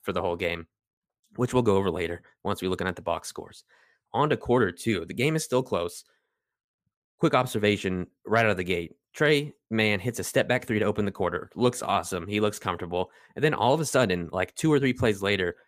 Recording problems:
none

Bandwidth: 15 kHz